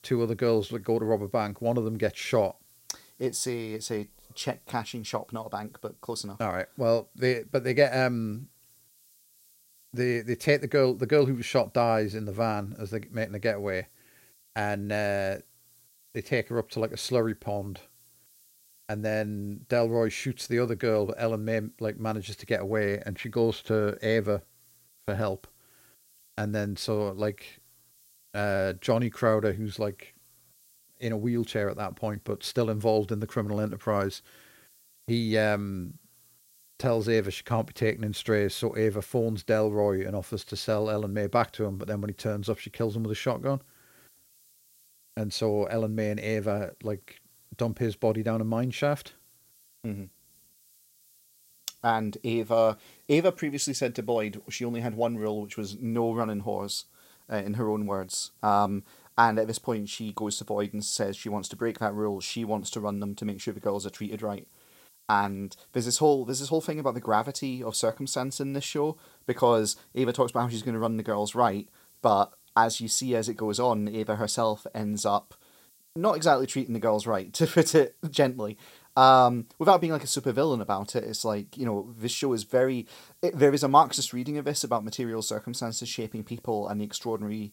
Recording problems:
hiss; faint; throughout; 30 dB below the speech

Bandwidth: 16 kHz